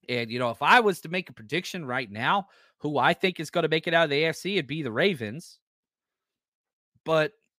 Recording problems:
none

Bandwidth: 15 kHz